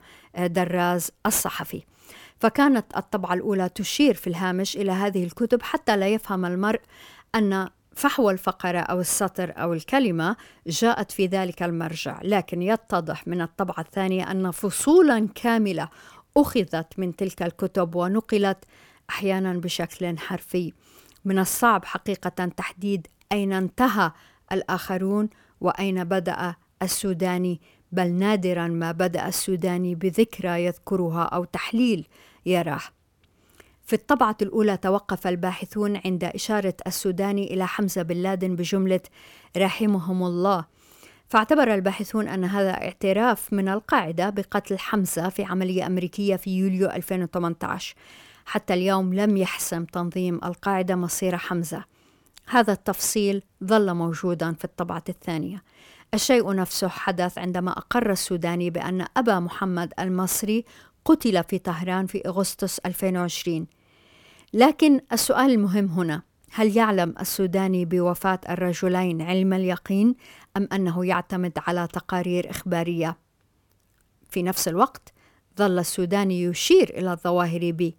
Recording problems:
none

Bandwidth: 17 kHz